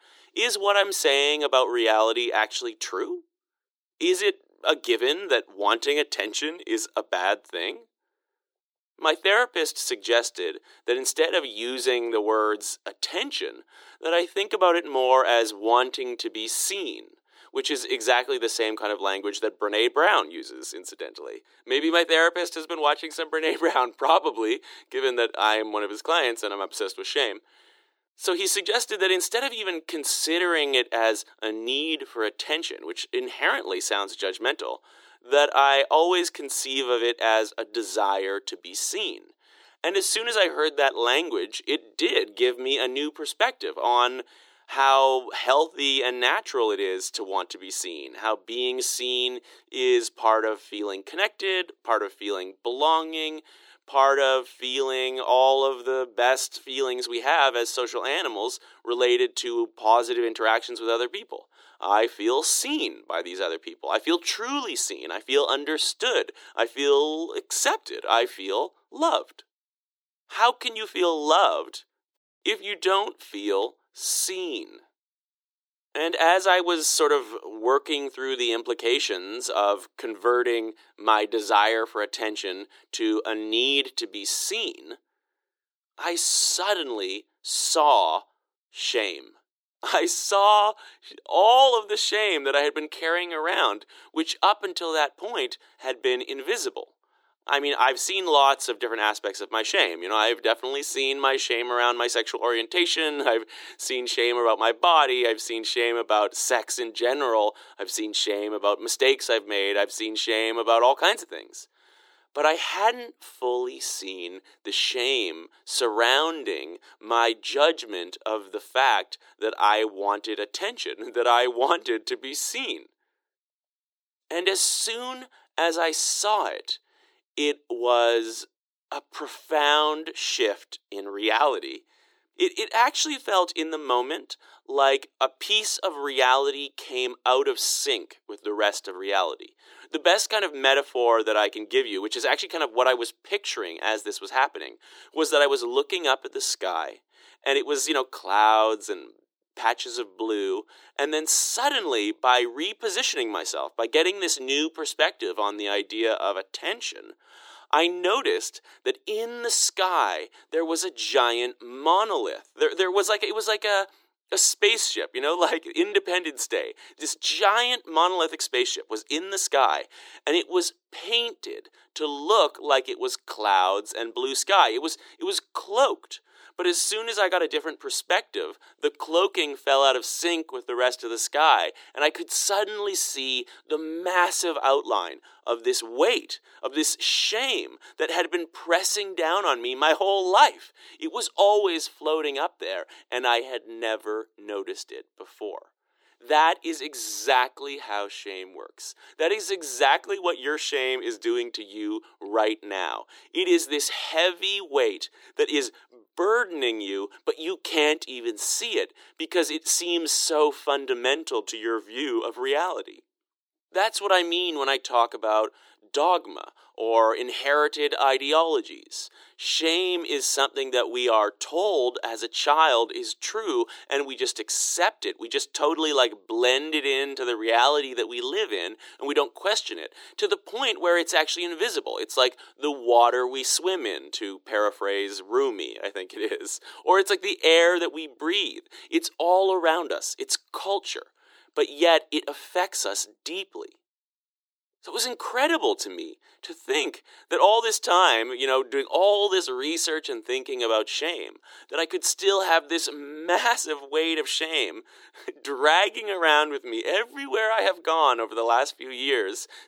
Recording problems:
thin; very; fading below 350 Hz

